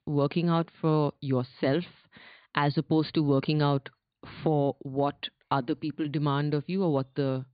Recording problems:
high frequencies cut off; severe; nothing above 4.5 kHz

